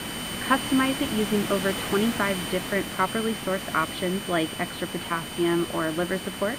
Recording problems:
muffled; very; fading above 4 kHz
high-pitched whine; loud; throughout; 3 kHz, 9 dB below the speech
hiss; loud; throughout; 7 dB below the speech
background chatter; faint; throughout; 3 voices, 25 dB below the speech

